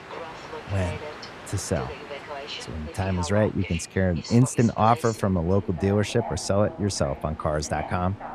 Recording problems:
train or aircraft noise; noticeable; throughout; 15 dB below the speech

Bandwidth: 14 kHz